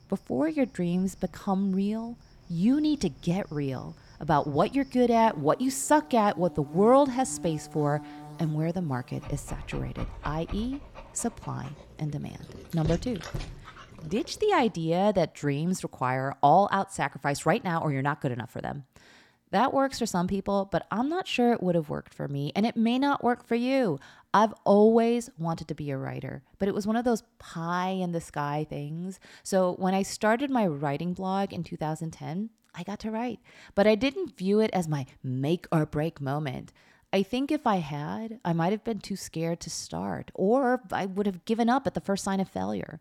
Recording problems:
animal sounds; noticeable; until 14 s; 15 dB below the speech

